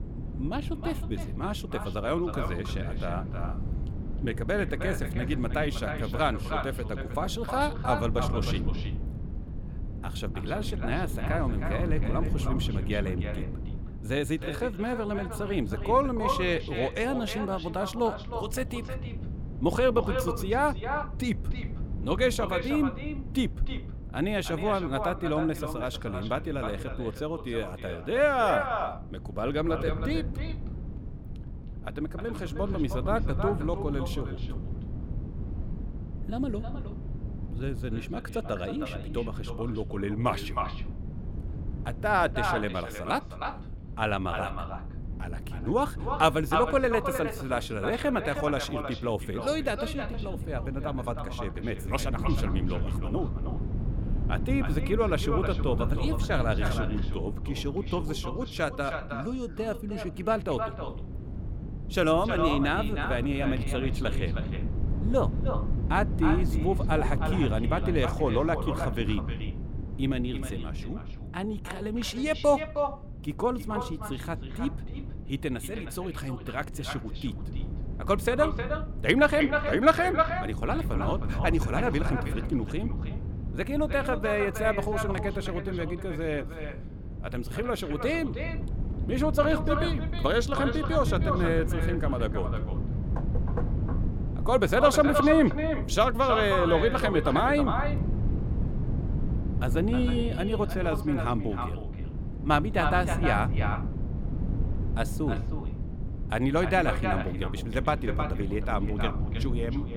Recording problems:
echo of what is said; strong; throughout; 310 ms later, 7 dB below the speech
wind noise on the microphone; occasional gusts; 15 dB below the speech

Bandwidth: 17 kHz